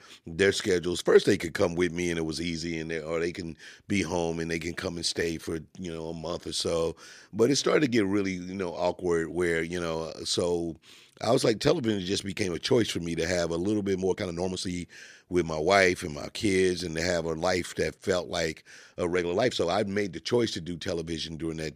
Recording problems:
uneven, jittery; strongly; from 5 to 20 s

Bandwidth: 14.5 kHz